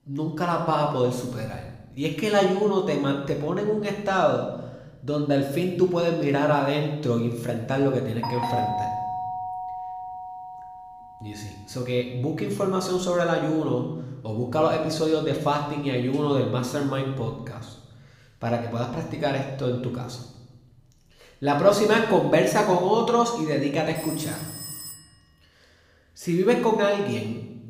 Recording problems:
room echo; noticeable; dies away in 0.9 s
off-mic speech; somewhat distant
doorbell; noticeable; from 8 to 11 s; peak 2 dB below the speech
phone ringing; noticeable; from 24 to 25 s; peak 10 dB below the speech

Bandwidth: 15 kHz